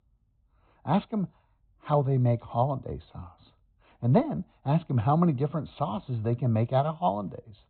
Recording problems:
high frequencies cut off; severe; nothing above 4 kHz

